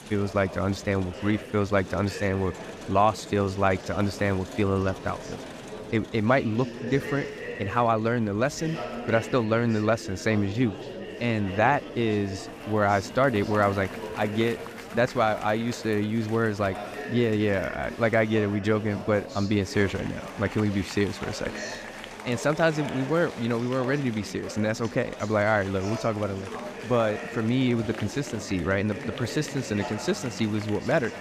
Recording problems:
murmuring crowd; noticeable; throughout; 10 dB below the speech

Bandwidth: 14.5 kHz